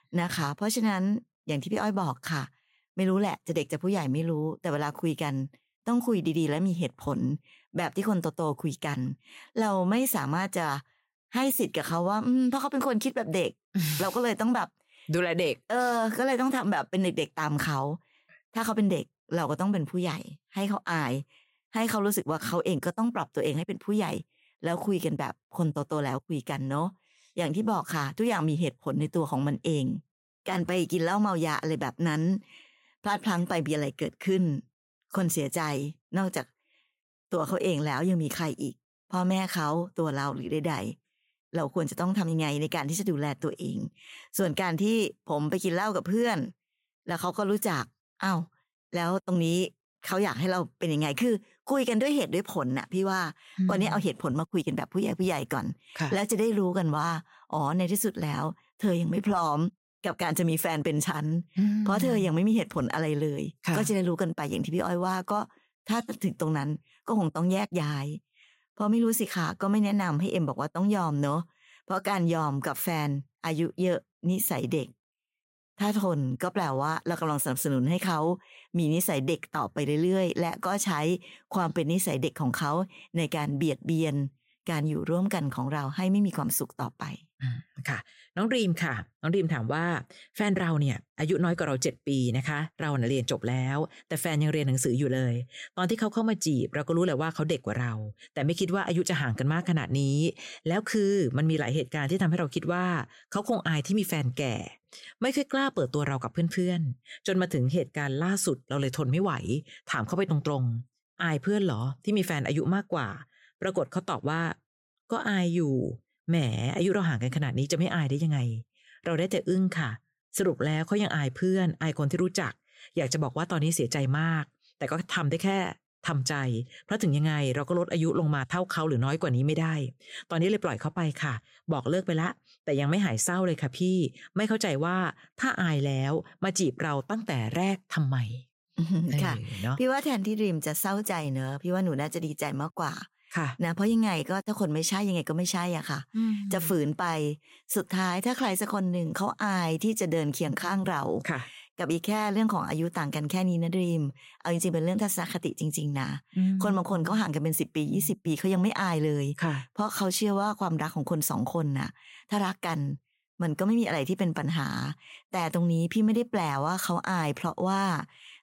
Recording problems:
none

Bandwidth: 16 kHz